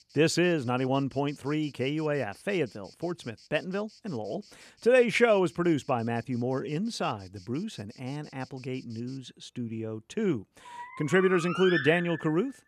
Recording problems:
animal sounds; loud; throughout; 7 dB below the speech

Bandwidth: 14.5 kHz